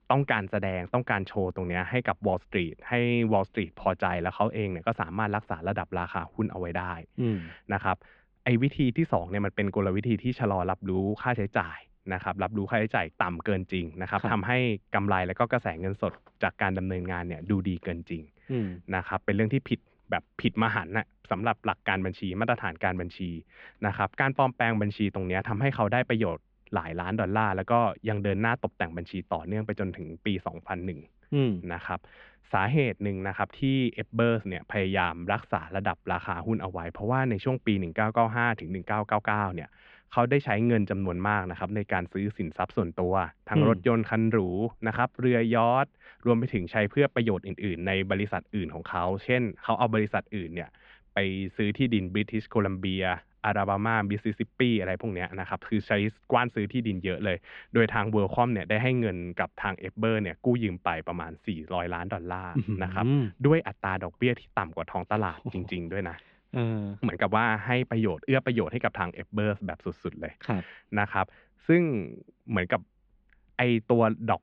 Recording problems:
muffled; very; fading above 3 kHz

